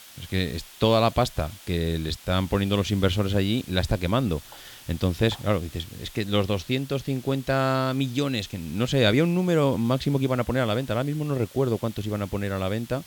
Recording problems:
hiss; noticeable; throughout; 20 dB below the speech

